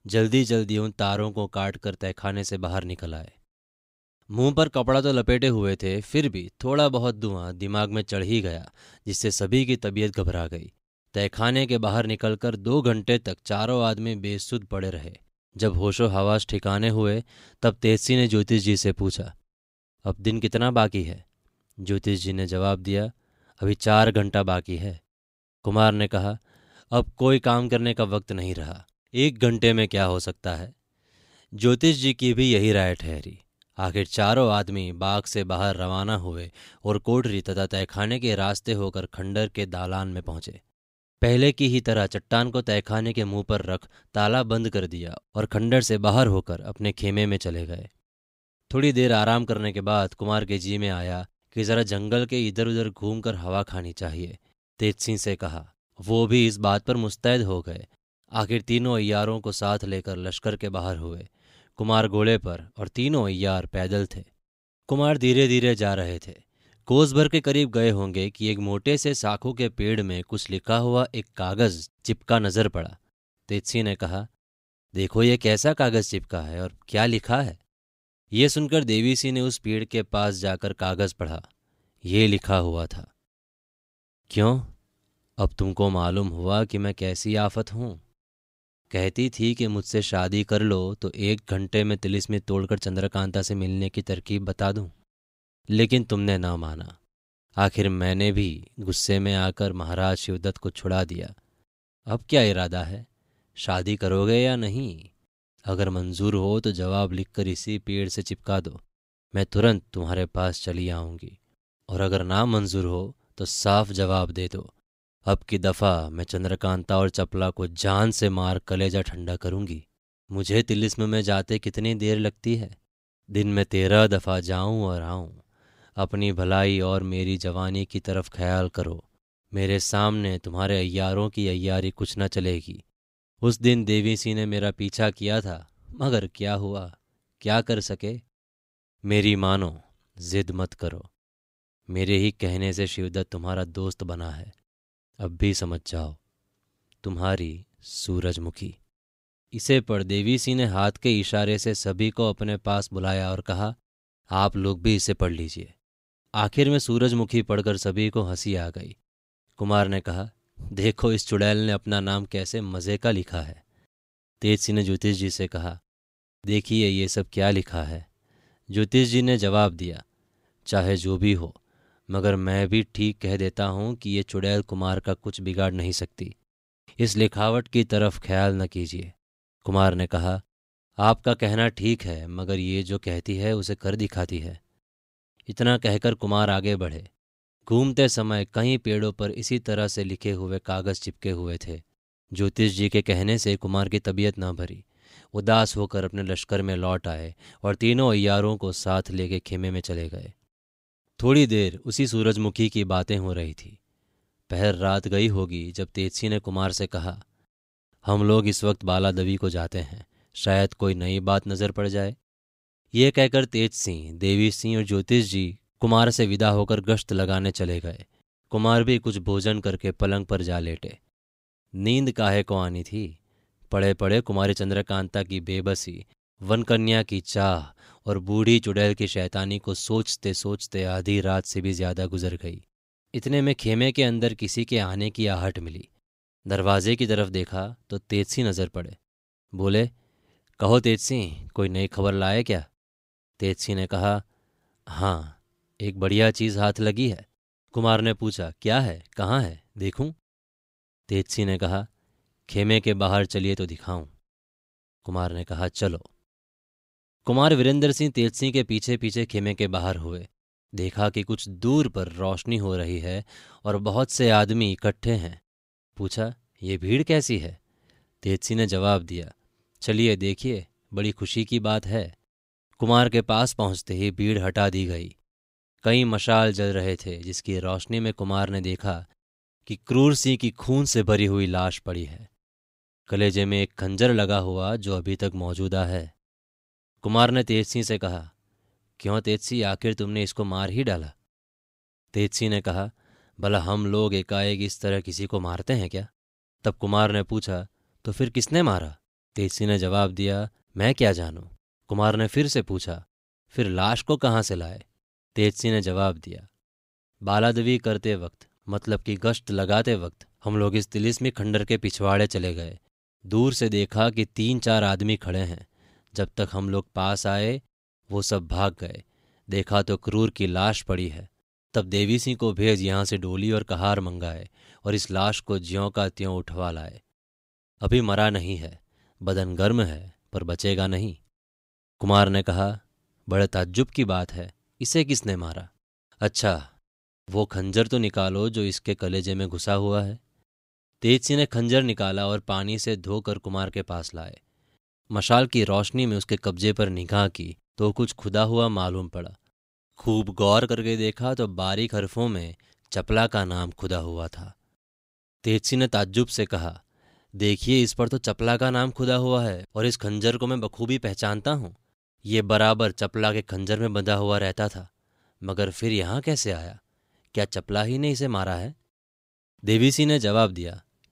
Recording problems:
none

